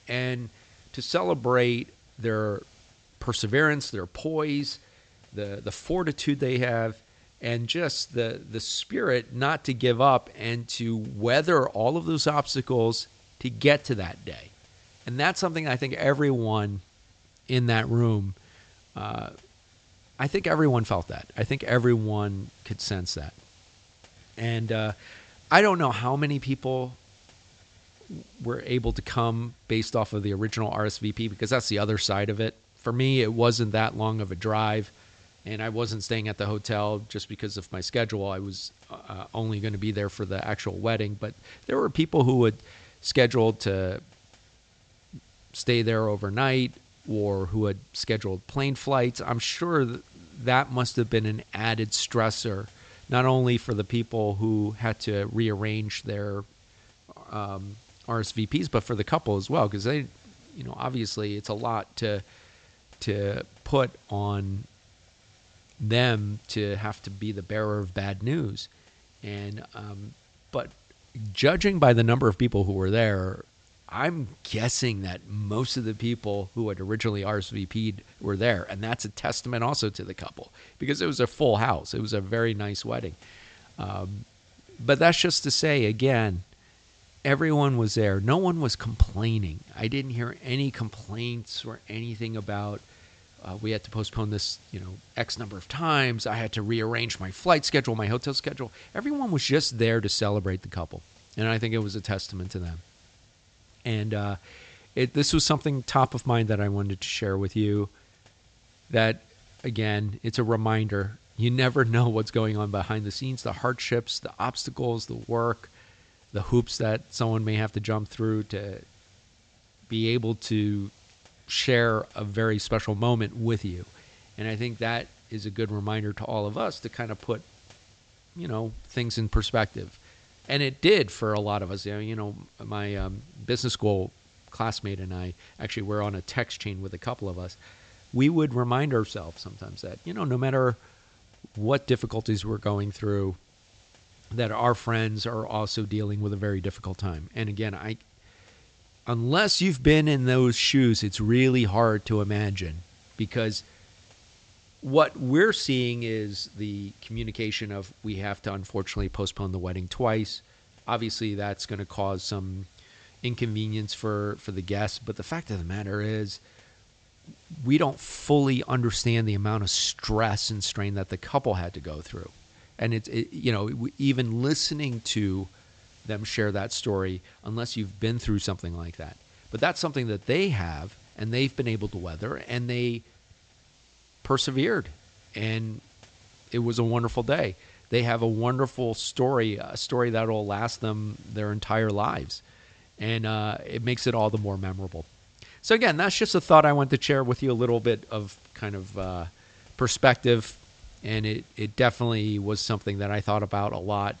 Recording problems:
high frequencies cut off; noticeable; nothing above 8 kHz
hiss; faint; throughout; 30 dB below the speech

